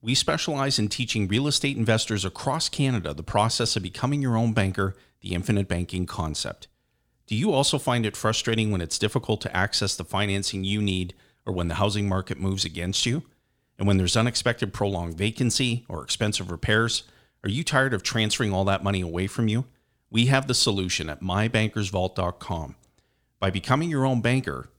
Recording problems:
none

